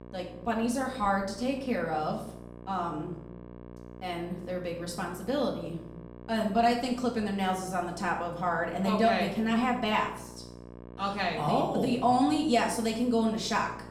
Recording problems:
off-mic speech; far
room echo; slight; dies away in 0.6 s
electrical hum; faint; throughout; 60 Hz, 20 dB below the speech

